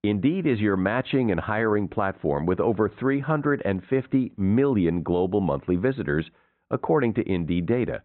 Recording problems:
high frequencies cut off; severe; nothing above 4 kHz
muffled; very slightly; fading above 2 kHz

